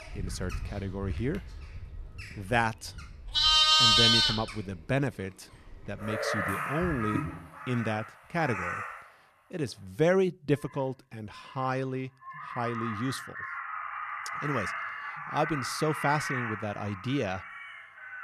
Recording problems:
animal sounds; very loud; throughout; 4 dB above the speech

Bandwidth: 14 kHz